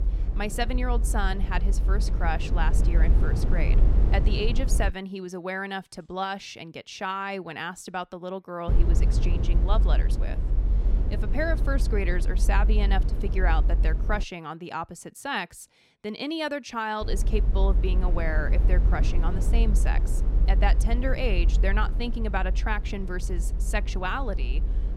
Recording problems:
low rumble; noticeable; until 5 s, from 8.5 to 14 s and from 17 s on; 10 dB below the speech

